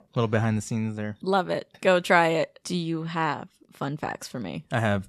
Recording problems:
none

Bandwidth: 13.5 kHz